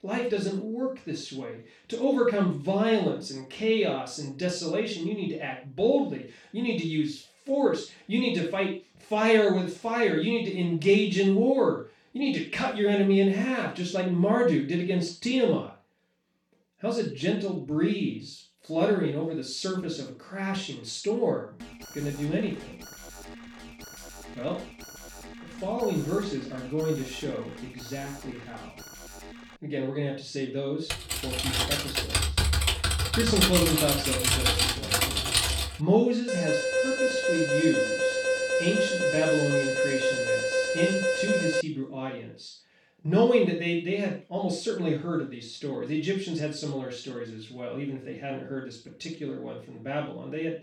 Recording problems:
off-mic speech; far
room echo; noticeable; dies away in 0.3 s
alarm; faint; from 22 to 30 s; peak 15 dB below the speech
keyboard typing; loud; from 31 to 36 s; peak 6 dB above the speech
alarm; loud; from 36 to 42 s; peak 3 dB above the speech

